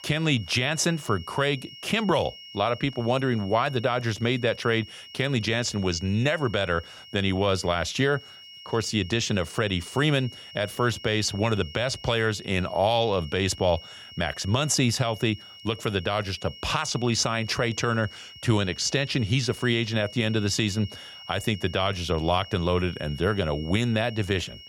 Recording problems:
high-pitched whine; noticeable; throughout; 3 kHz, 15 dB below the speech

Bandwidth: 18 kHz